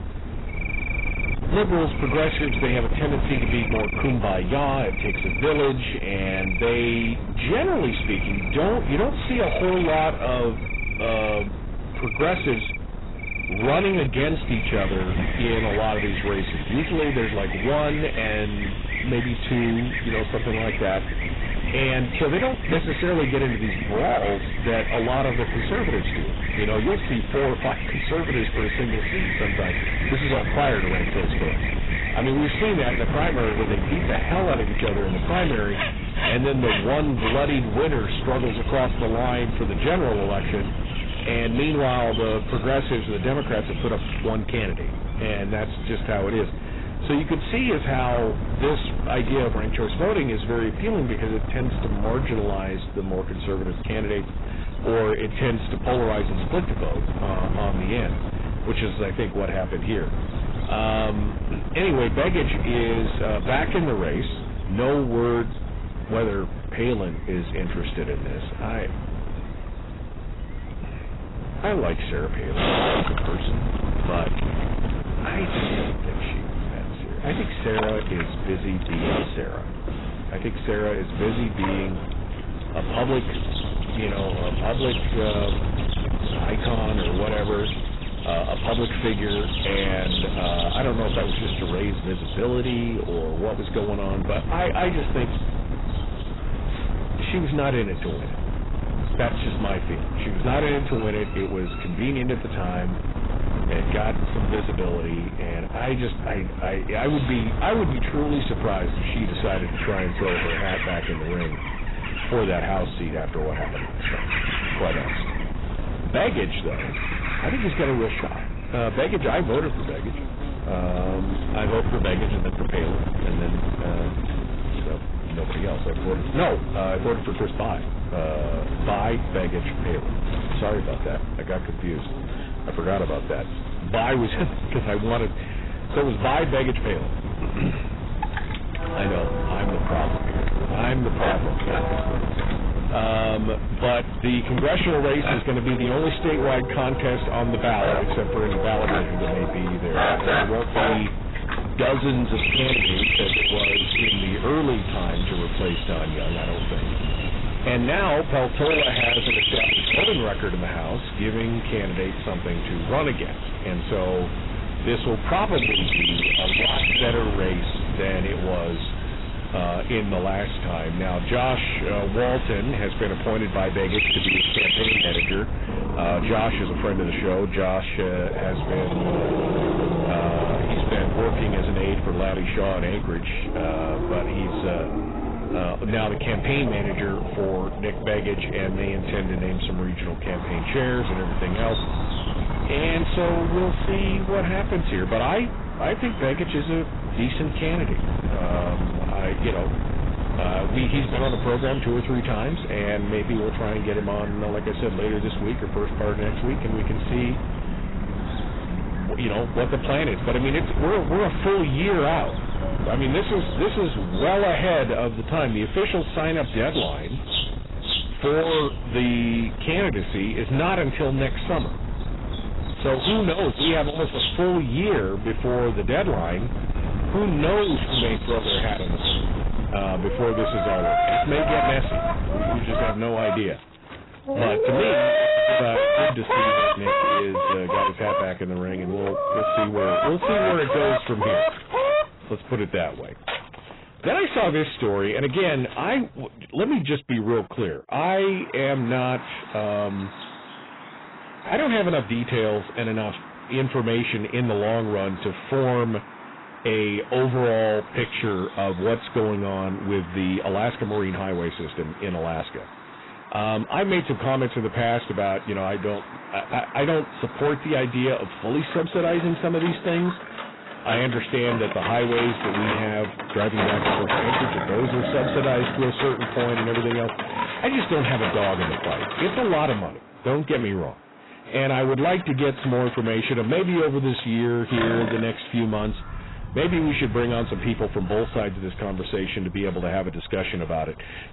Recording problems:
distortion; heavy; 15% of the sound clipped
garbled, watery; badly; nothing above 4 kHz
animal sounds; loud; throughout; 3 dB below the speech
wind noise on the microphone; occasional gusts; until 3:53; 10 dB below the speech

